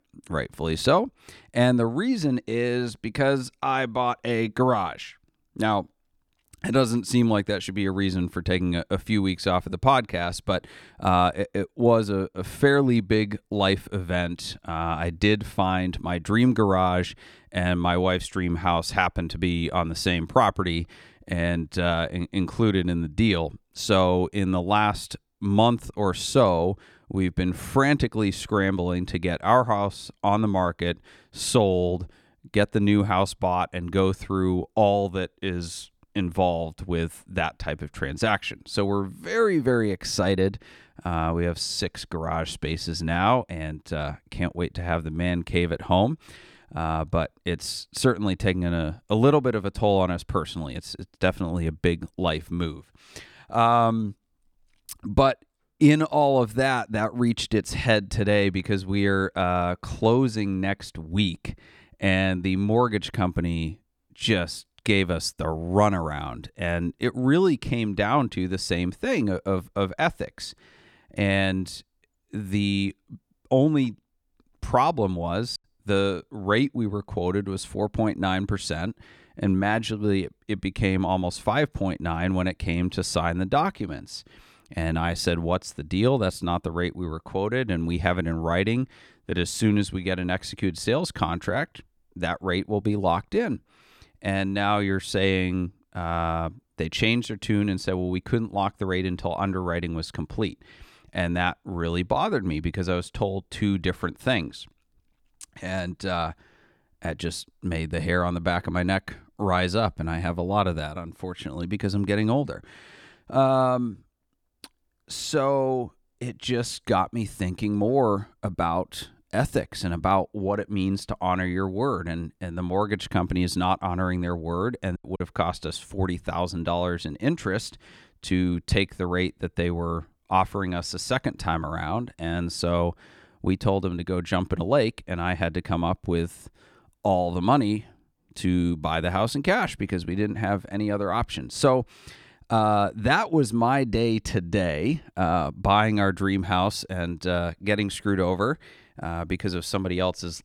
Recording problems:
choppy; very; at 1:16 and at 2:05; 7% of the speech affected

